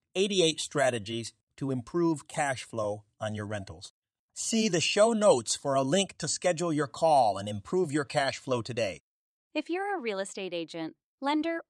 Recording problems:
none

